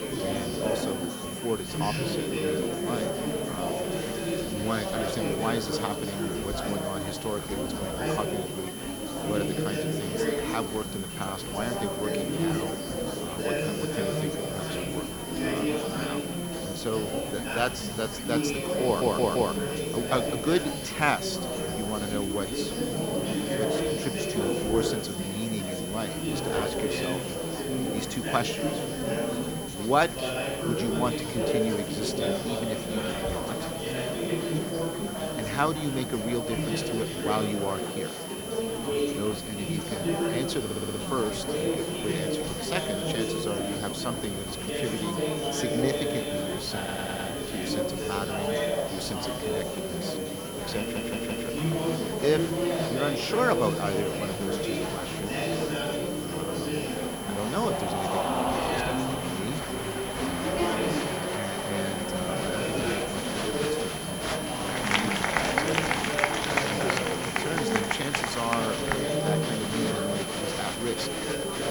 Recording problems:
murmuring crowd; very loud; throughout; 3 dB above the speech
high-pitched whine; loud; throughout; 3 kHz, 6 dB below the speech
hiss; noticeable; throughout; 10 dB below the speech
household noises; faint; throughout; 25 dB below the speech
audio stuttering; 4 times, first at 19 s

